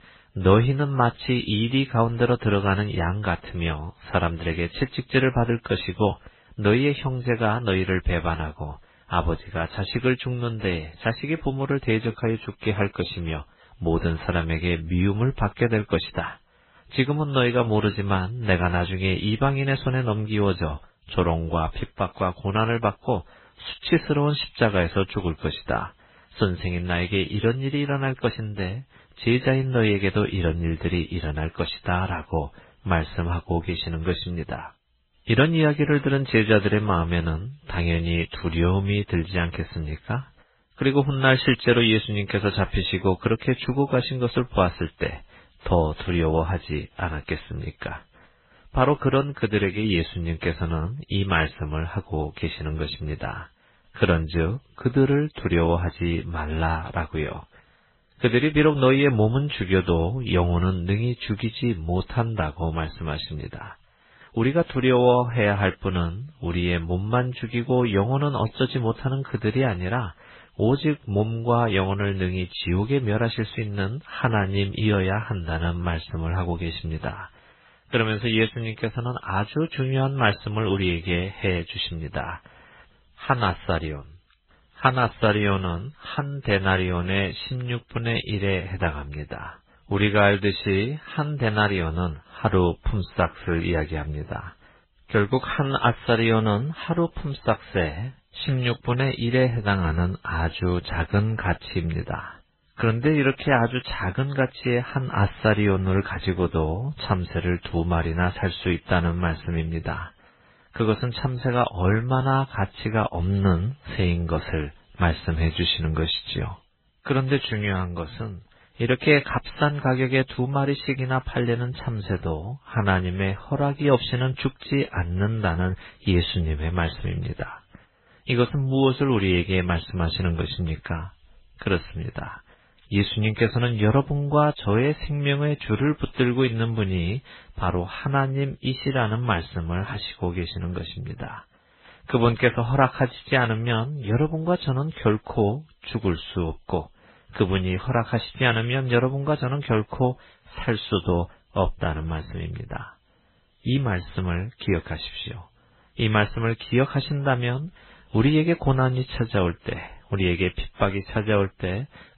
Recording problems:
garbled, watery; badly
high frequencies cut off; severe; nothing above 4 kHz

